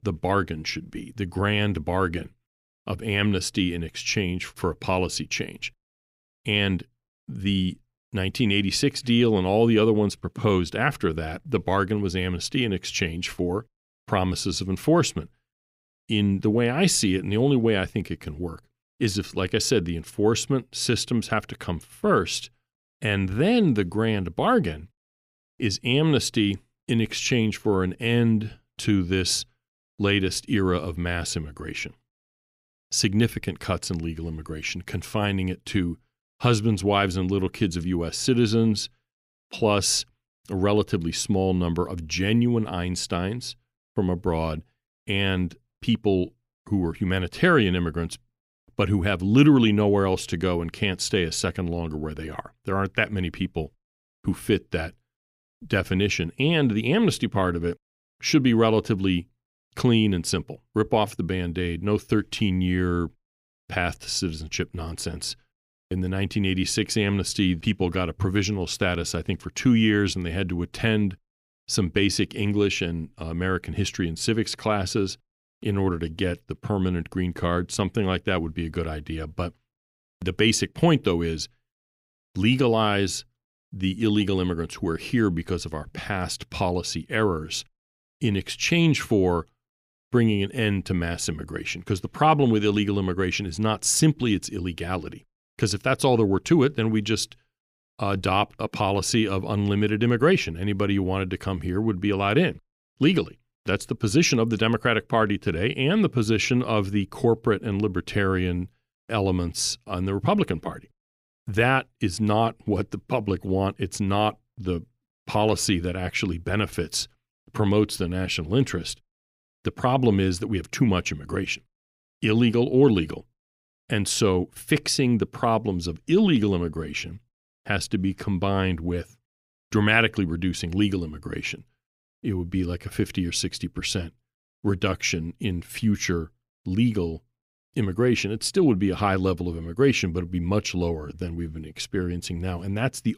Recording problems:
none

